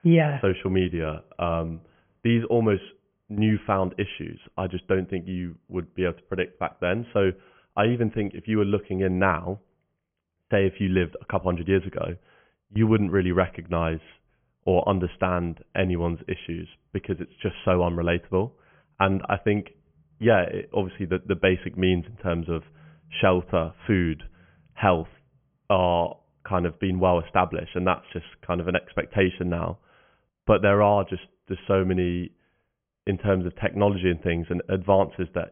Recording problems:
high frequencies cut off; severe; nothing above 3.5 kHz

